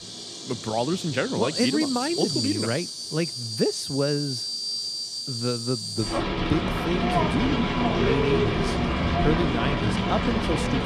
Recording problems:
animal sounds; very loud; throughout; 1 dB above the speech

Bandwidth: 14 kHz